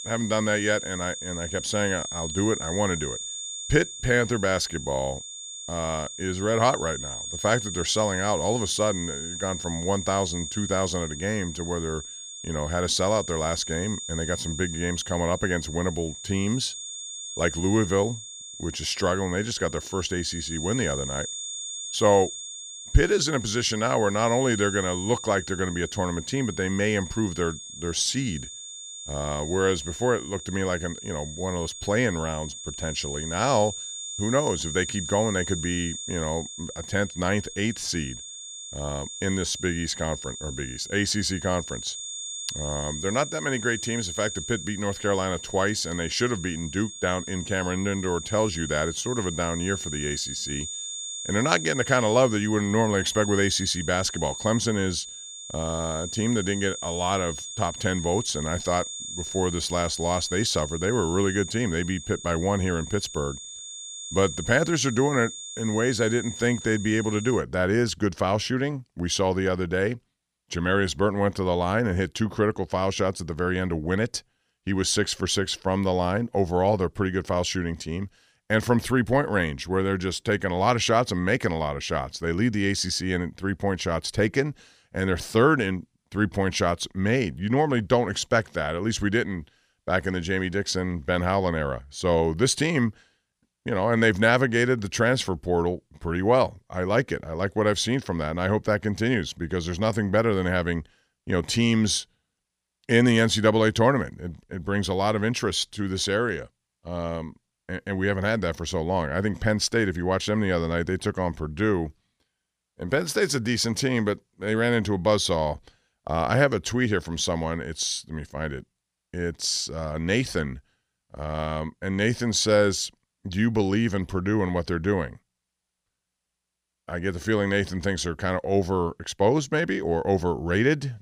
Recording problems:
high-pitched whine; loud; until 1:07; 7 kHz, 8 dB below the speech

